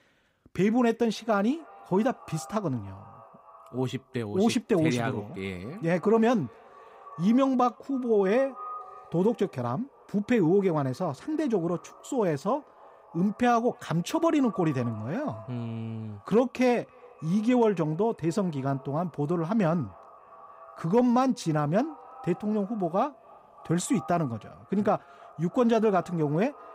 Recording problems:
echo of what is said; faint; throughout; 280 ms later, 20 dB below the speech

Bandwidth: 15.5 kHz